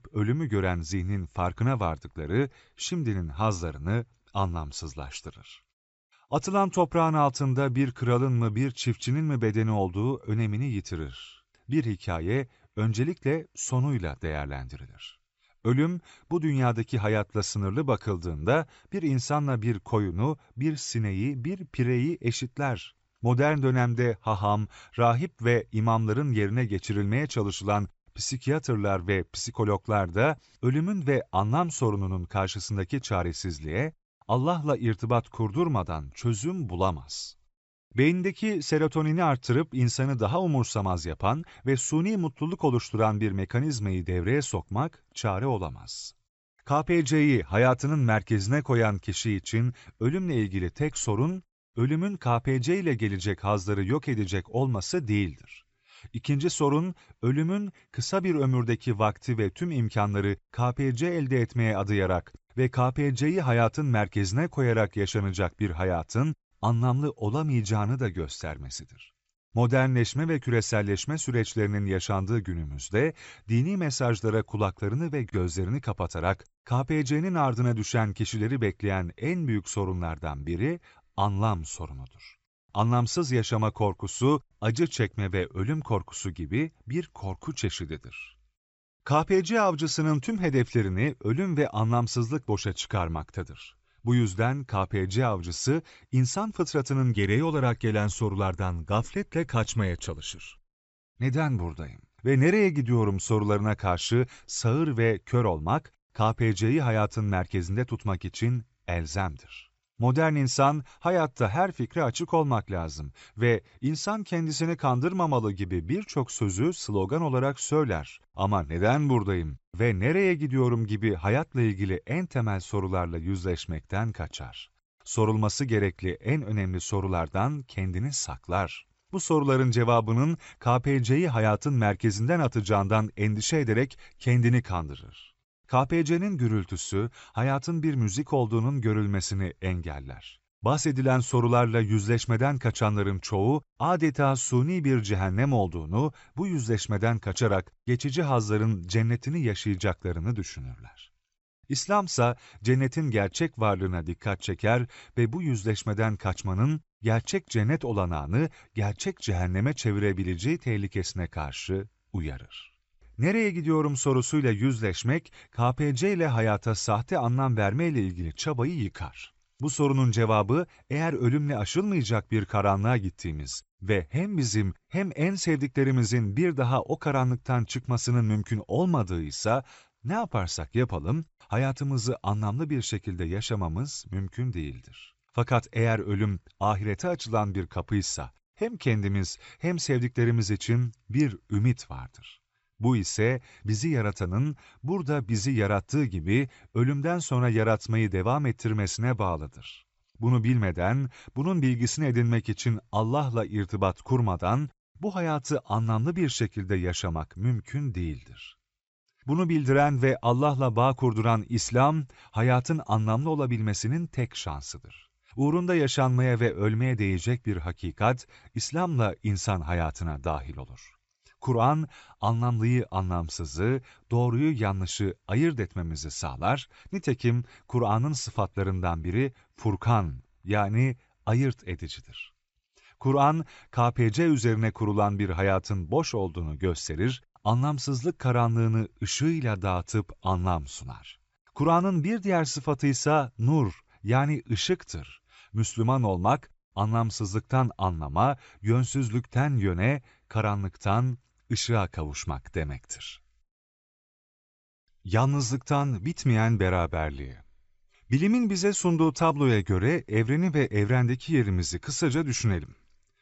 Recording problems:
high frequencies cut off; noticeable; nothing above 7.5 kHz

